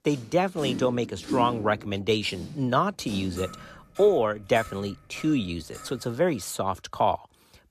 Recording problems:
household noises; noticeable; until 6 s; 10 dB below the speech

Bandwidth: 14.5 kHz